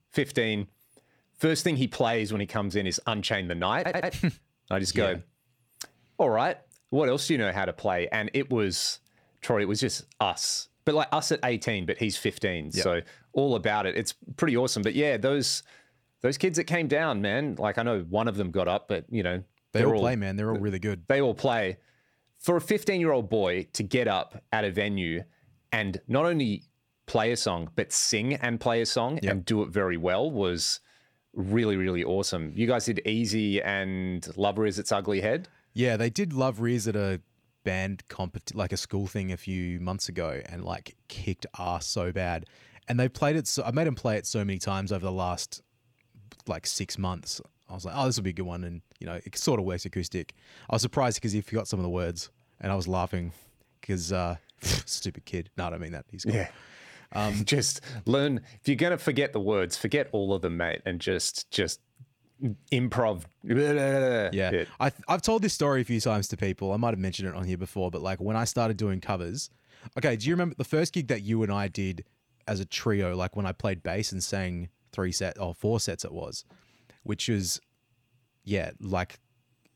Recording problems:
audio stuttering; at 4 s

